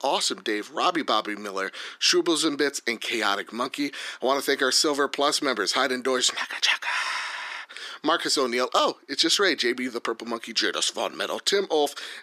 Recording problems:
thin; somewhat; fading below 300 Hz

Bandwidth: 14.5 kHz